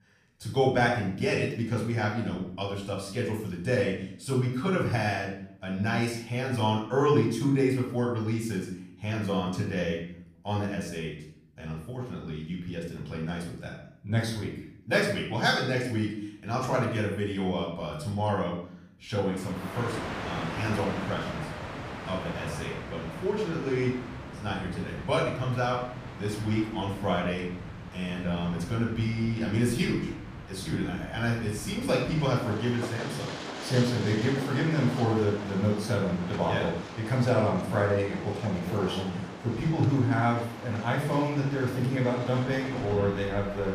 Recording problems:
off-mic speech; far
room echo; noticeable; dies away in 0.6 s
train or aircraft noise; loud; from 20 s on; 10 dB below the speech

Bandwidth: 15 kHz